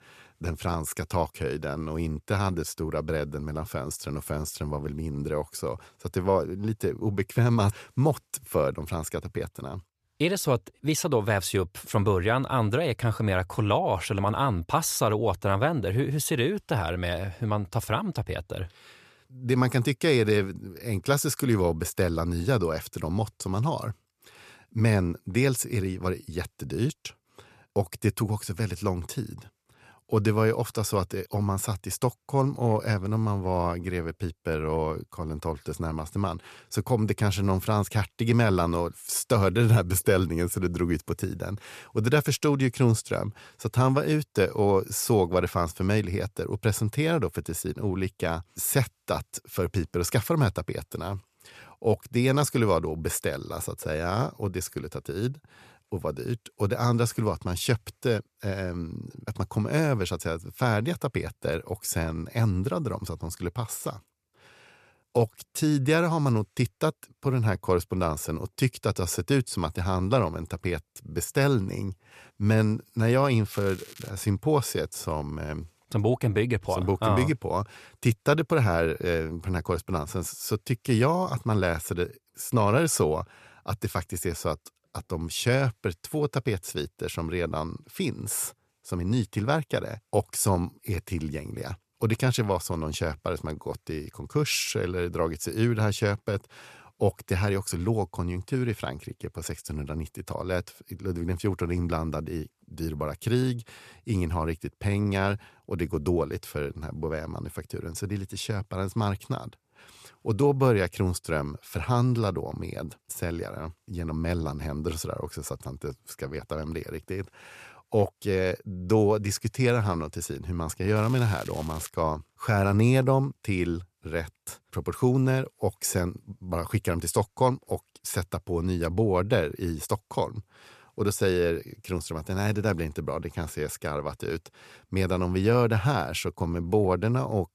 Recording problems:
crackling; noticeable; at 1:14 and at 2:01; 20 dB below the speech

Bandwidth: 14.5 kHz